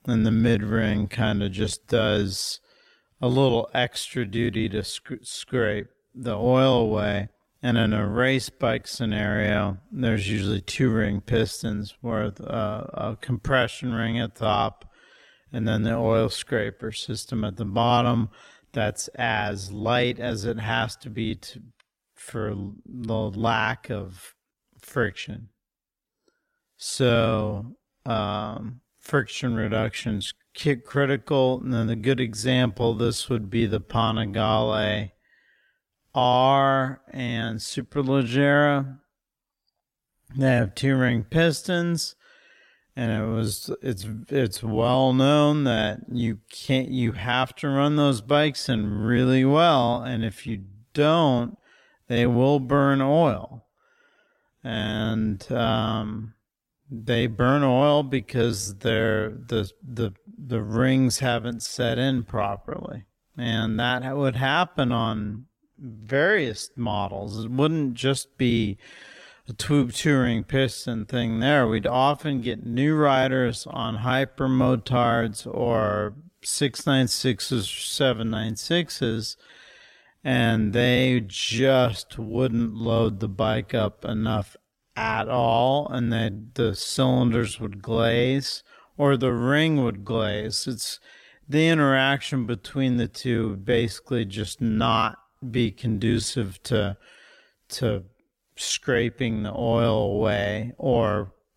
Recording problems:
wrong speed, natural pitch; too slow; 0.6 times normal speed

